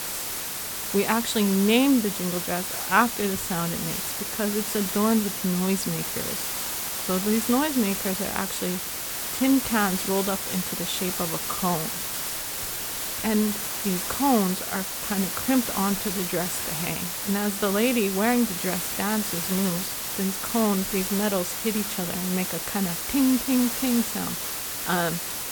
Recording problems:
hiss; loud; throughout; 2 dB below the speech

